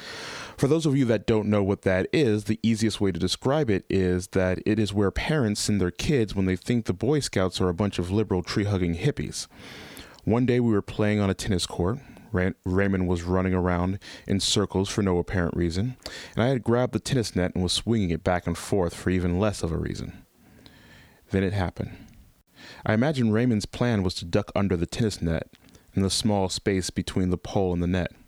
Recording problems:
squashed, flat; somewhat

